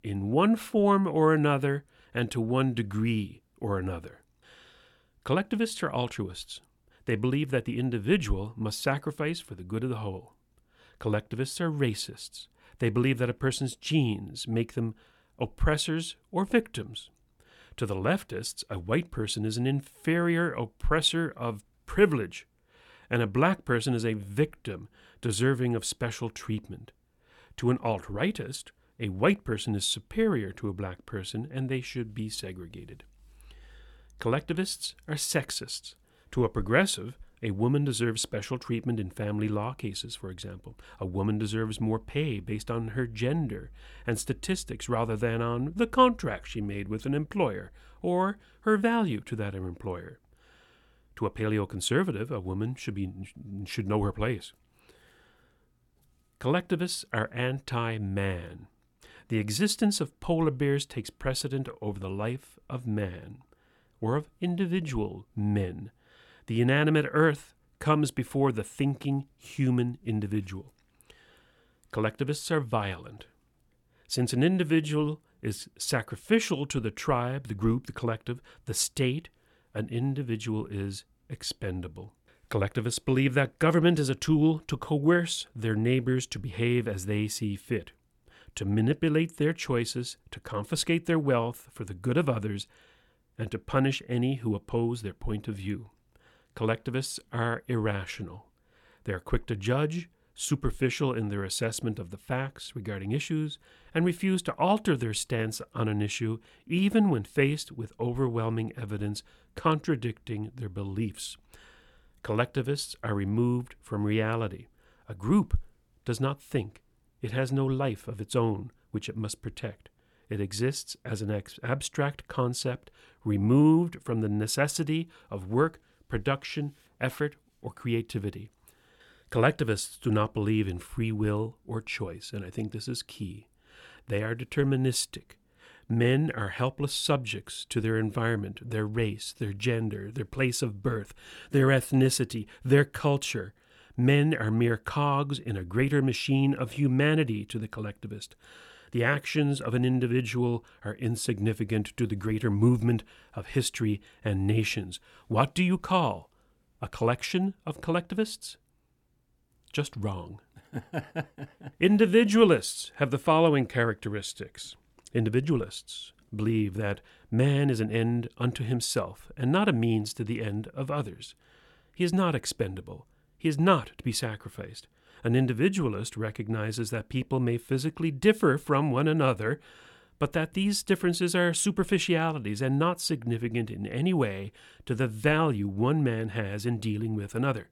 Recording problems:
none

